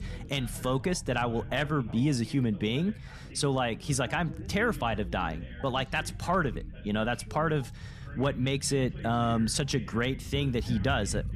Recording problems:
background chatter; noticeable; throughout; 2 voices, 20 dB below the speech
low rumble; faint; throughout; 25 dB below the speech

